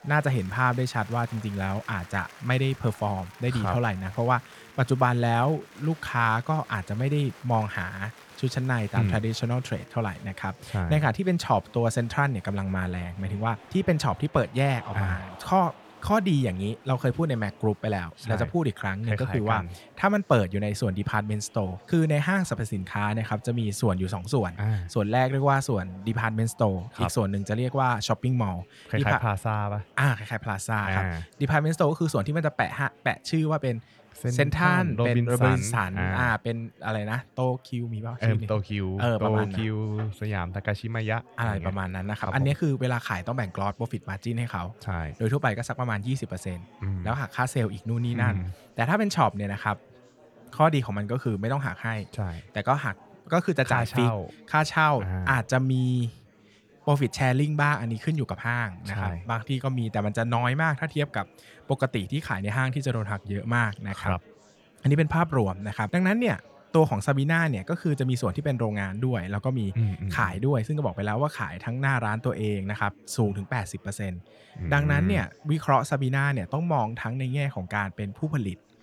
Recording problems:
murmuring crowd; faint; throughout; 25 dB below the speech

